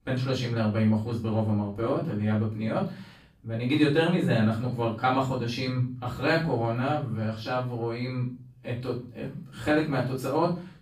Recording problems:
off-mic speech; far
room echo; noticeable; dies away in 0.4 s

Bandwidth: 15 kHz